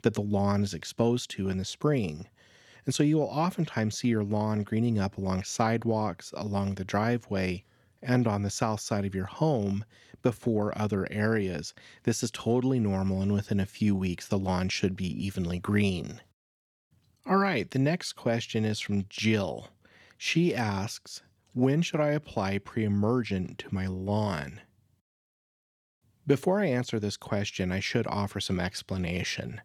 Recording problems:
none

